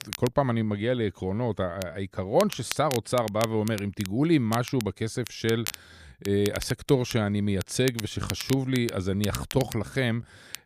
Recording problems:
crackle, like an old record; noticeable; 10 dB below the speech

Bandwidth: 14.5 kHz